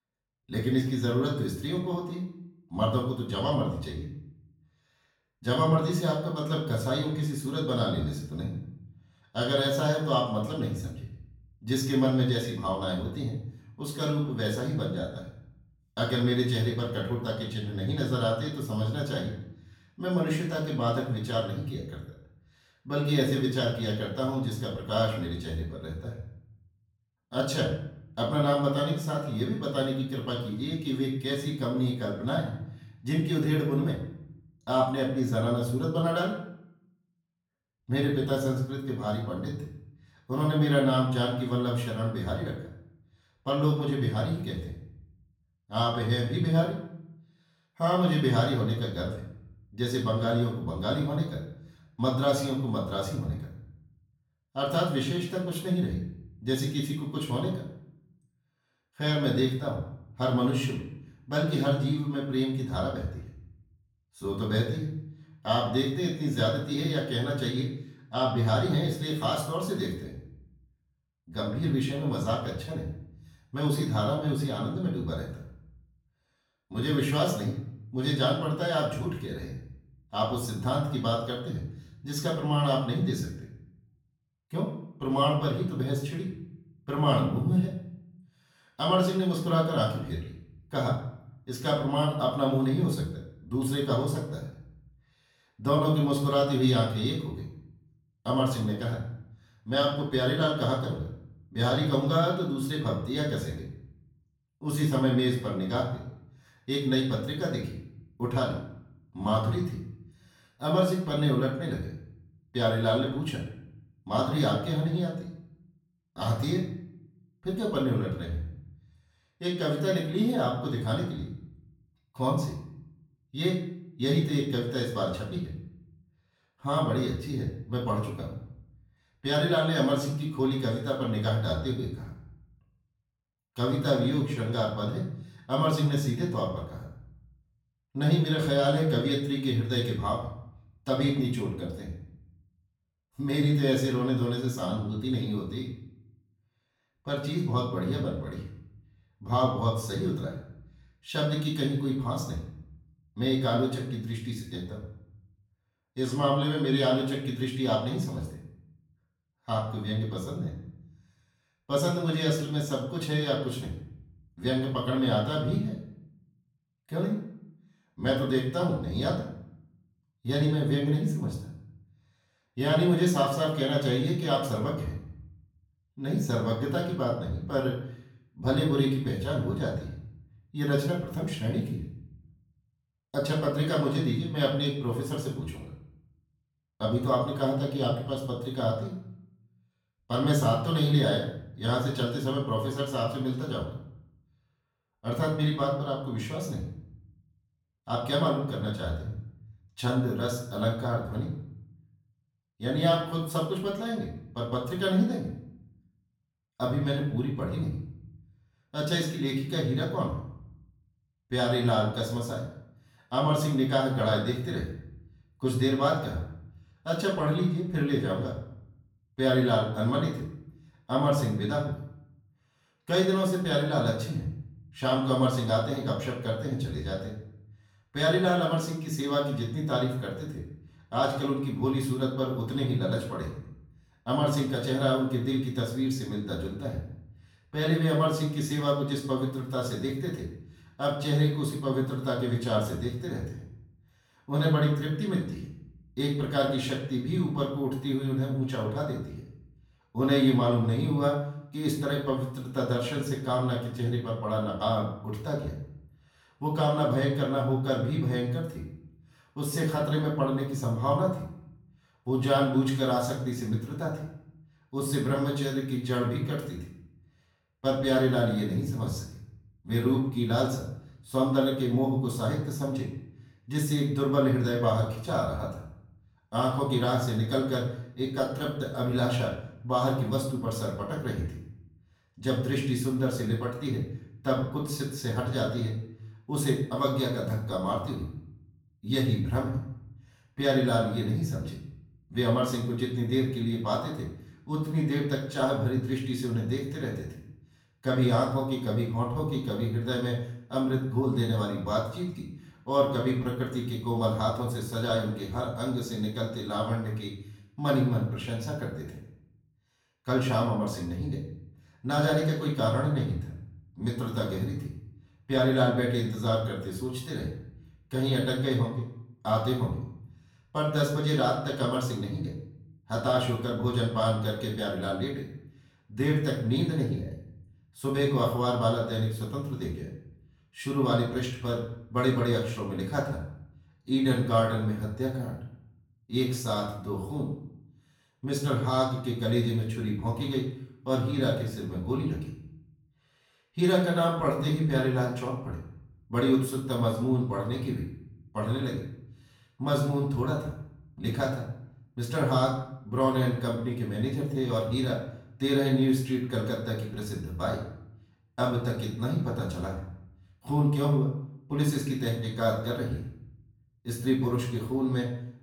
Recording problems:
off-mic speech; far
room echo; noticeable; dies away in 0.6 s

